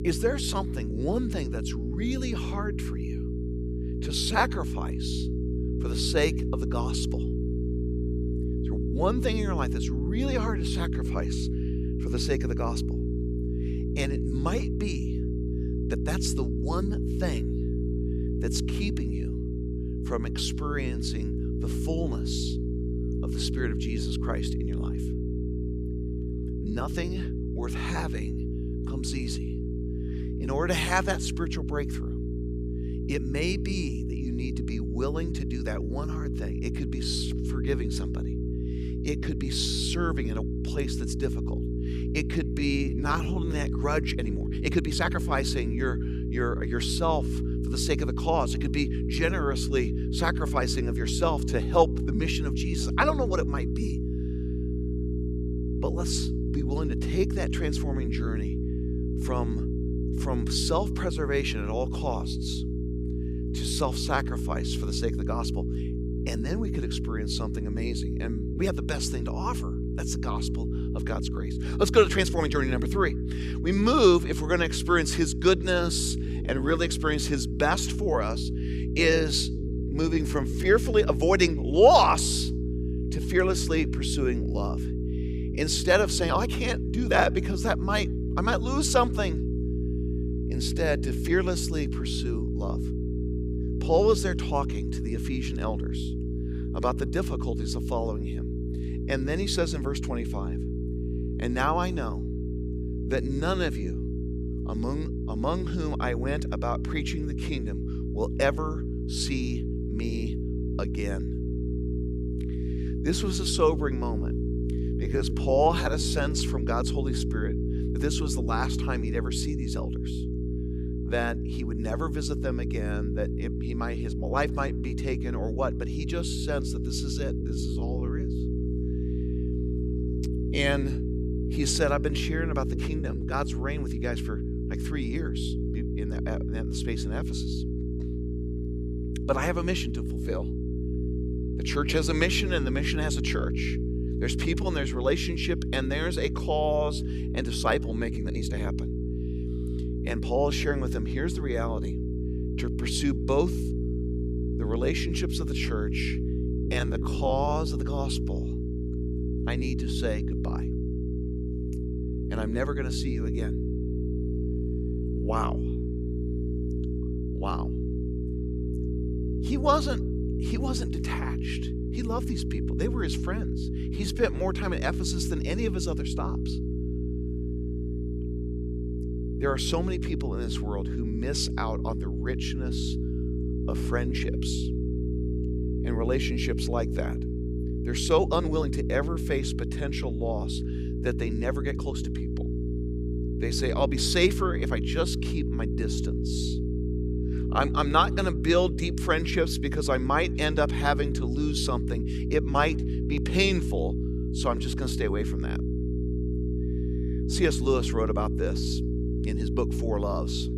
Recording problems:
electrical hum; loud; throughout; 60 Hz, 9 dB below the speech
uneven, jittery; strongly; from 27 s to 3:12

